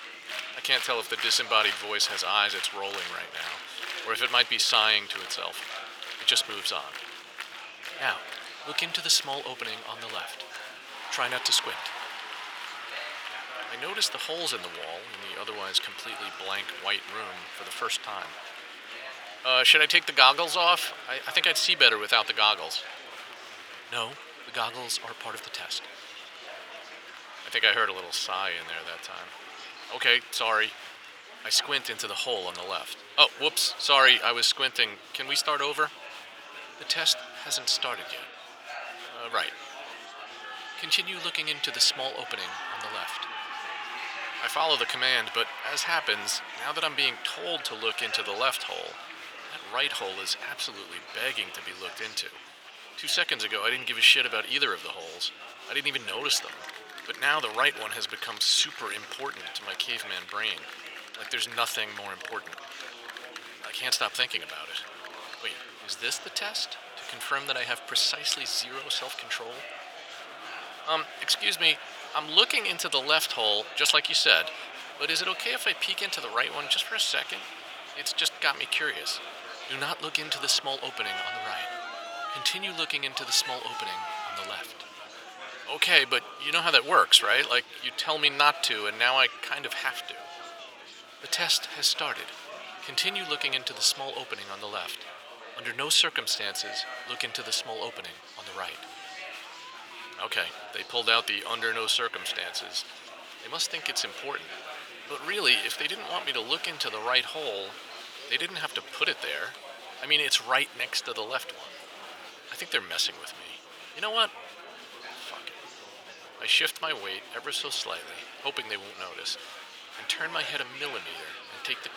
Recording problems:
thin; very; fading below 850 Hz
murmuring crowd; noticeable; throughout; 15 dB below the speech

